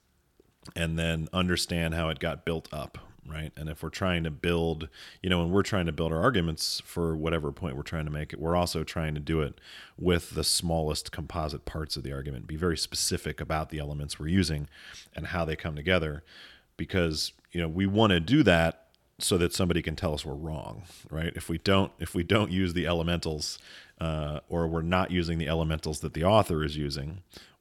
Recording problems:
none

